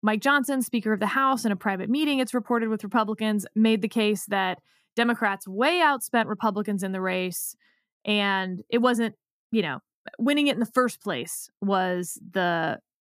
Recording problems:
none

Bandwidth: 14.5 kHz